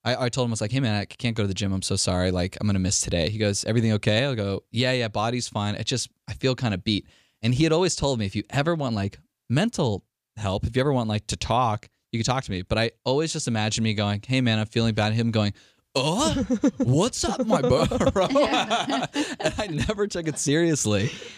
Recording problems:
none

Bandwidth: 15 kHz